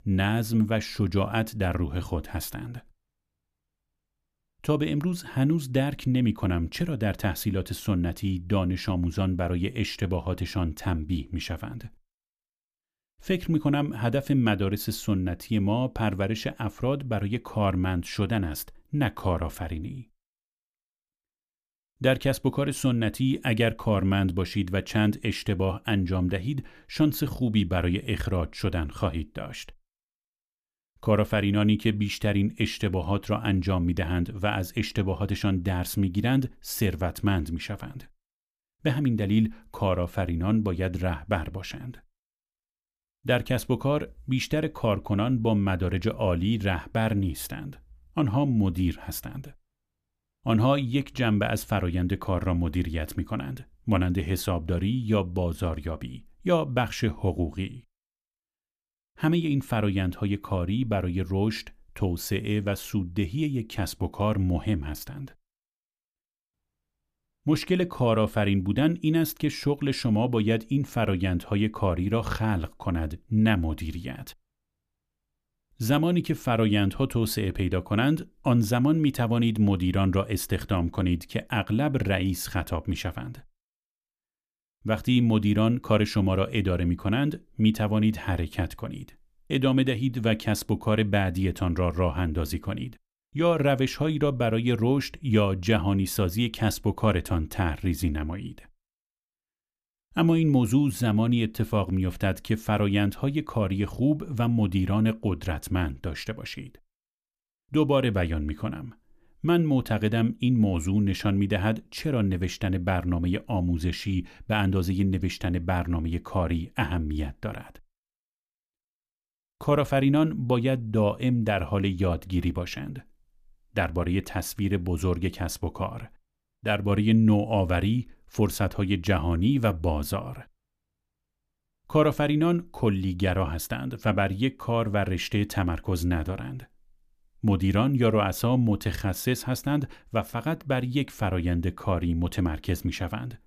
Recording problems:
none

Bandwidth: 14.5 kHz